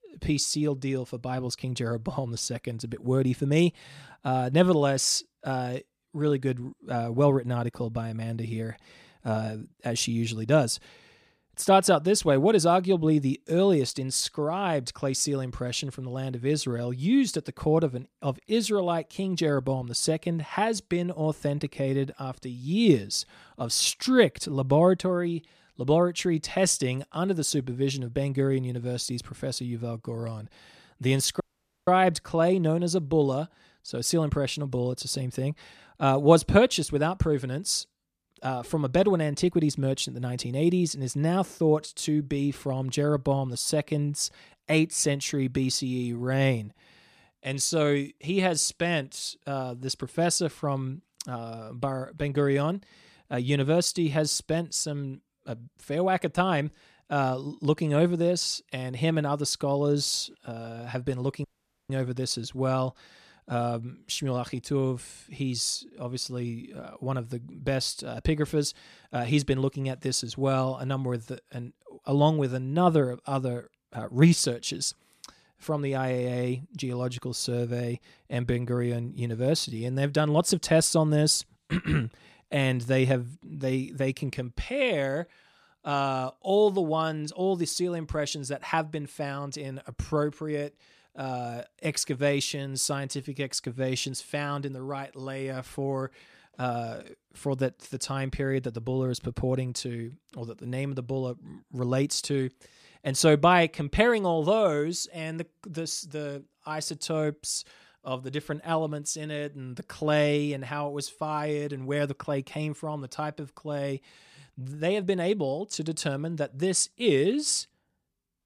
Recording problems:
audio cutting out; at 31 s and at 1:01

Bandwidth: 14.5 kHz